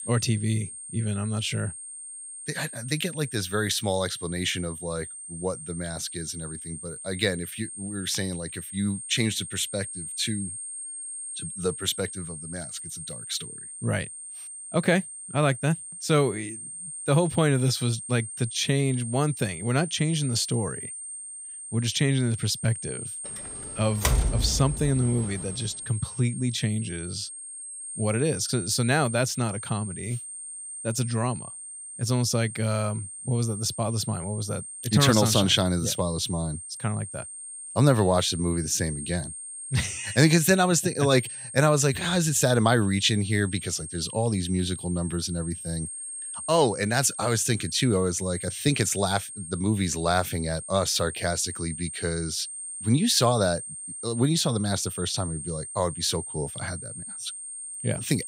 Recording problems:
high-pitched whine; loud; throughout; 8.5 kHz, 9 dB below the speech
door banging; loud; from 24 to 25 s; peak 1 dB above the speech

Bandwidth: 15.5 kHz